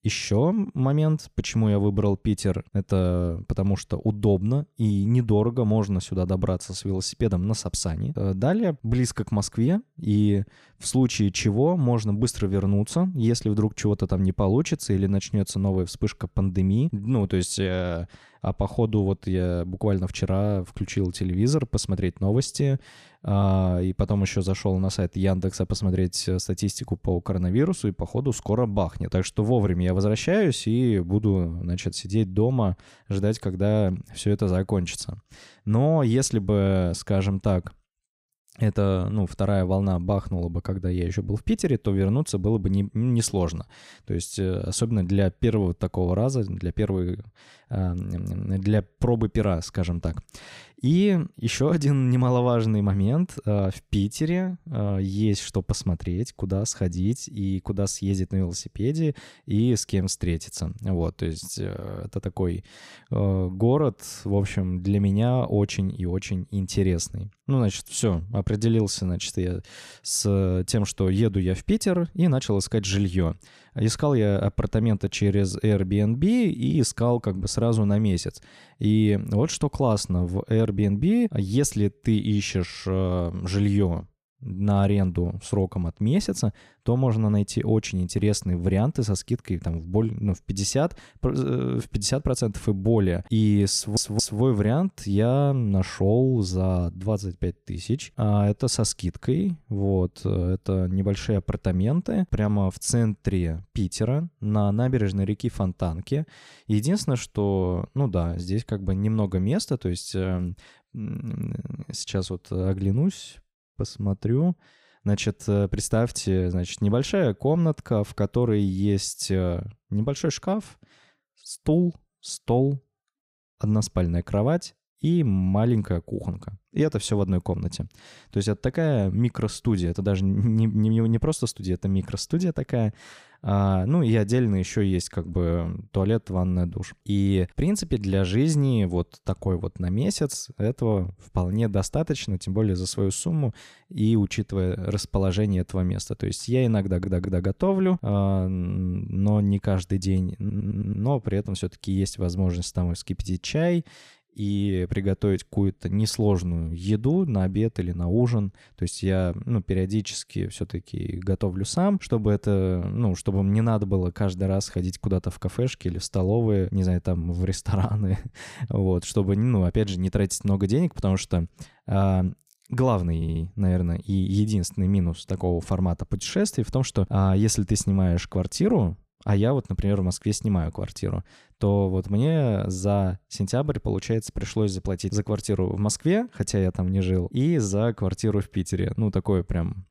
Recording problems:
audio stuttering; 4 times, first at 1:34

